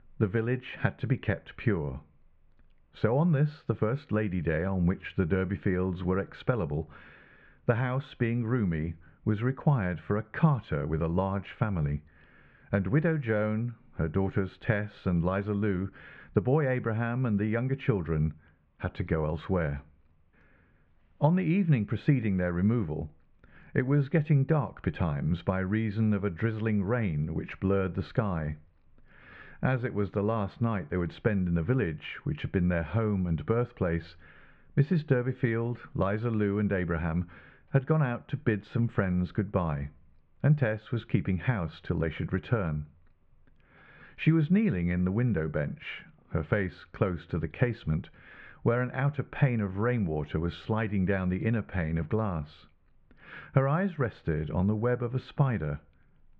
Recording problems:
muffled; very; fading above 2.5 kHz

